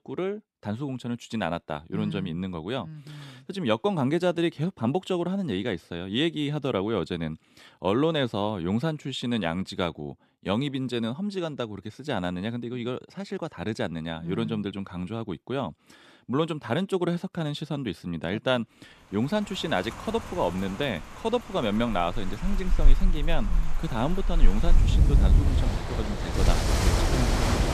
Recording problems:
rain or running water; very loud; from 19 s on; 3 dB above the speech

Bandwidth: 14 kHz